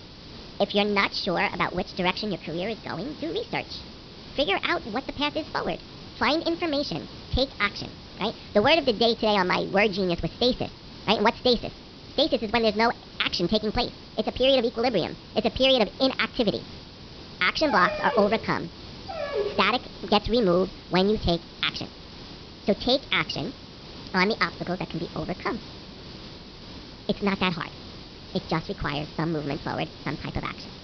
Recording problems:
wrong speed and pitch; too fast and too high; 1.5 times normal speed
high frequencies cut off; noticeable; nothing above 5.5 kHz
hiss; noticeable; throughout; 15 dB below the speech
dog barking; noticeable; from 18 to 20 s; peak 4 dB below the speech

